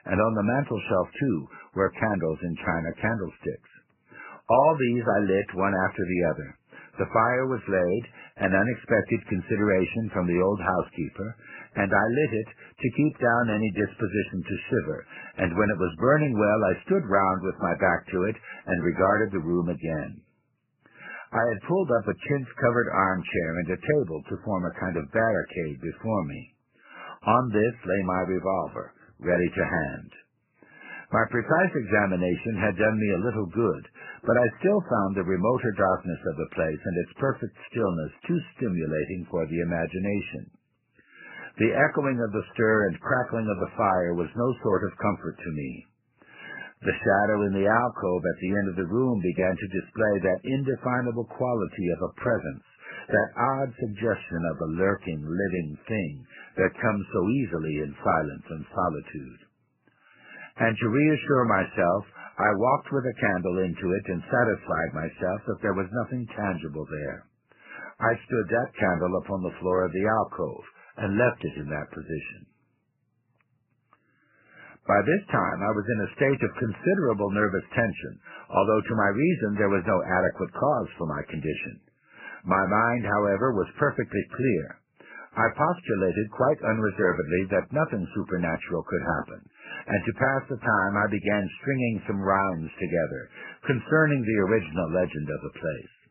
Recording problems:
garbled, watery; badly; nothing above 3 kHz

